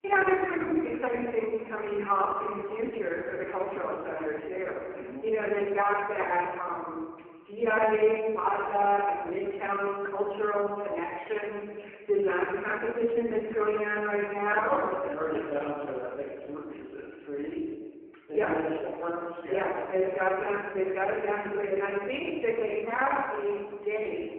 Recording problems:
phone-call audio; poor line
off-mic speech; far
room echo; noticeable; dies away in 1.3 s

